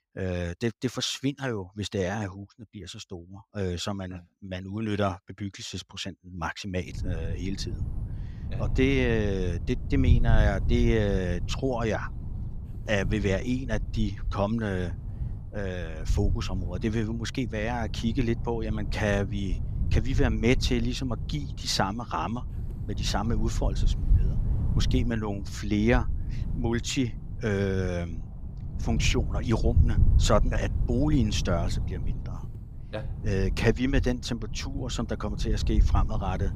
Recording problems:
wind noise on the microphone; occasional gusts; from 7 s on; 15 dB below the speech

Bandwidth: 15.5 kHz